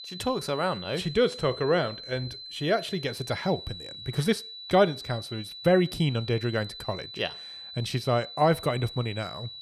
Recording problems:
high-pitched whine; noticeable; throughout; 4 kHz, 10 dB below the speech

